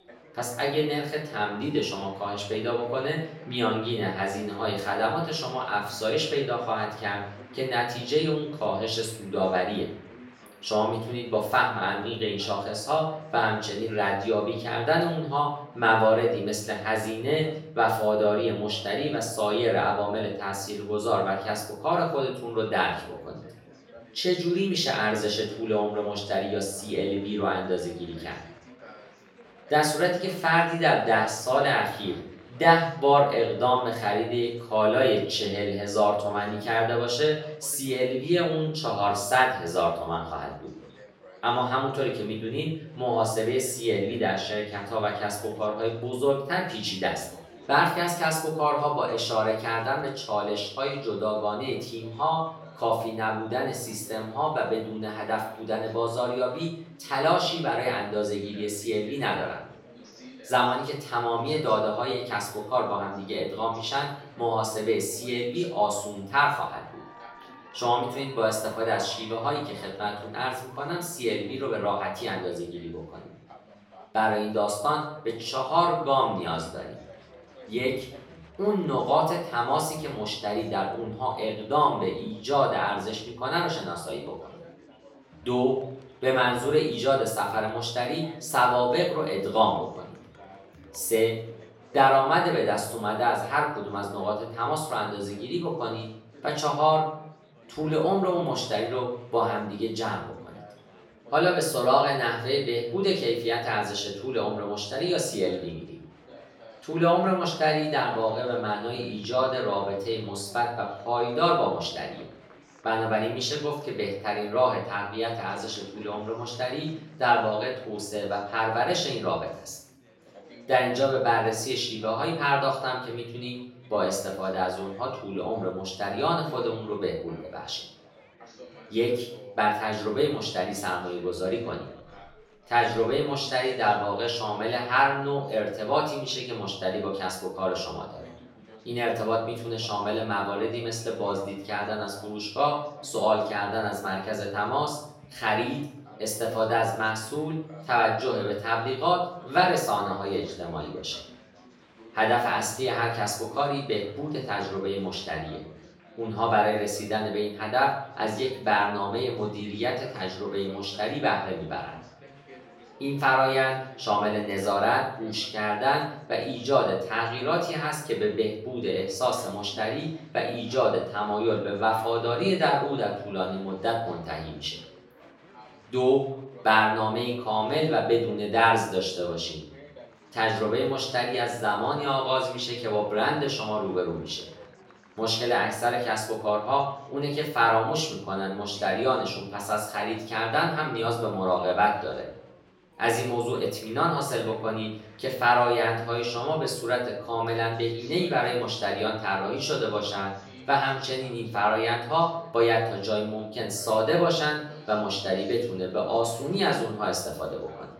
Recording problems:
off-mic speech; far
room echo; noticeable; dies away in 0.5 s
chatter from many people; faint; throughout; 25 dB below the speech

